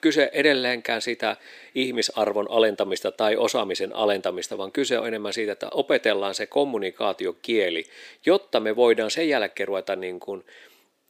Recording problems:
thin; very; fading below 350 Hz

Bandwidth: 15 kHz